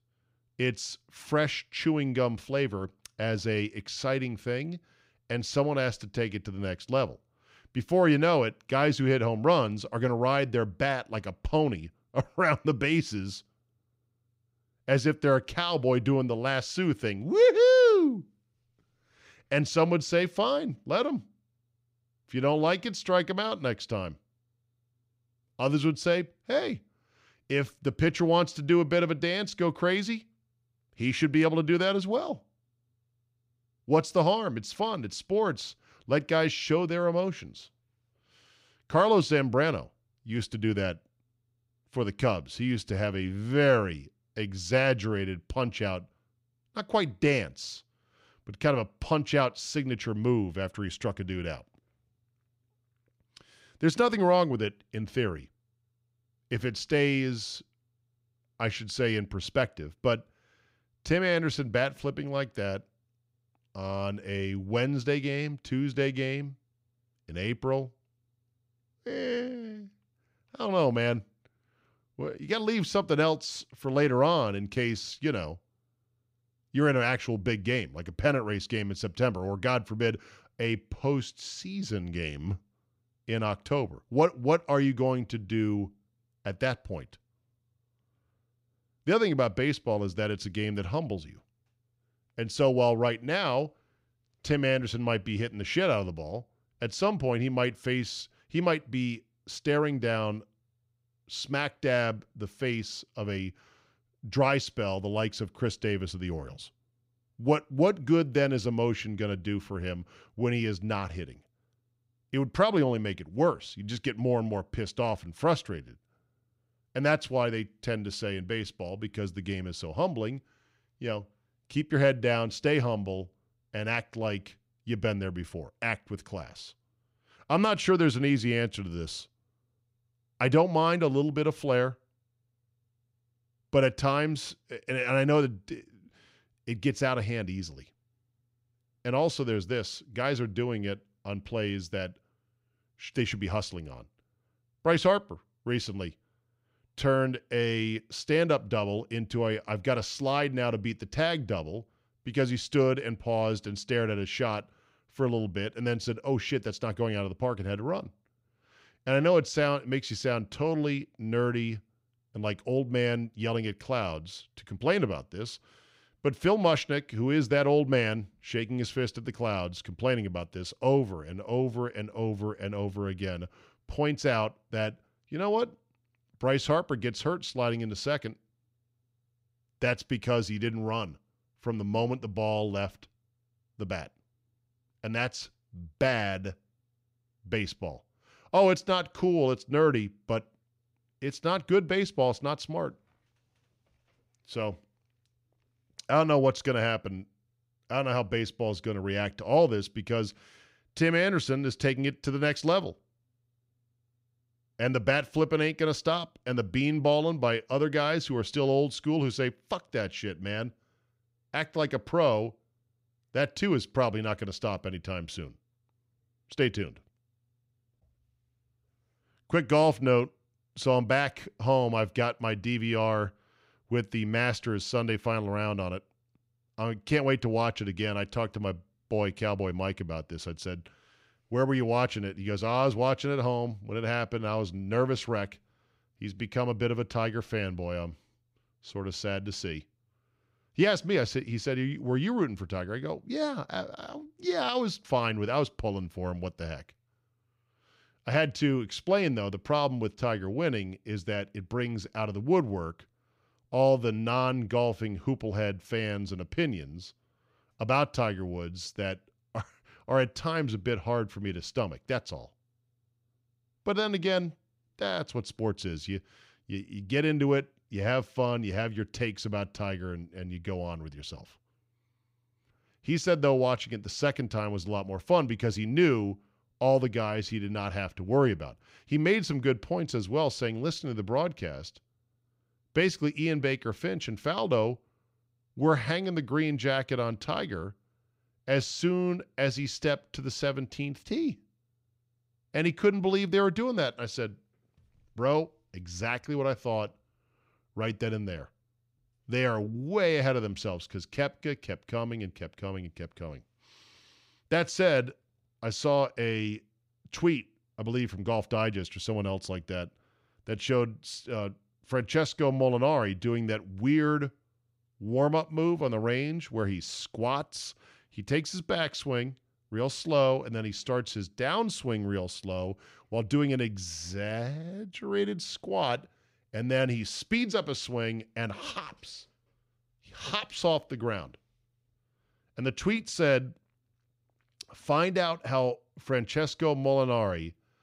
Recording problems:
none

